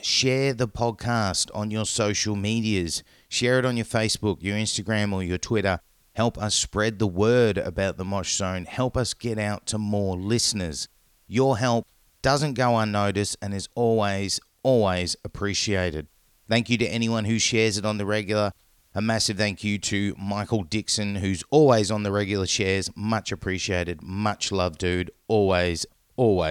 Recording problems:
abrupt cut into speech; at the end

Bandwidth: 18.5 kHz